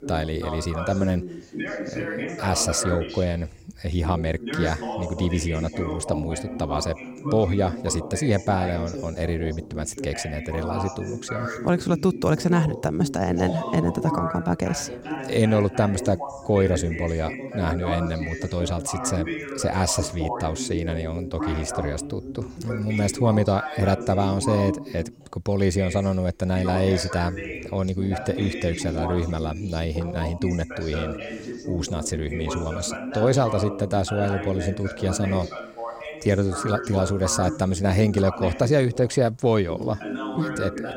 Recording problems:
background chatter; loud; throughout; 2 voices, 7 dB below the speech

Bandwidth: 16.5 kHz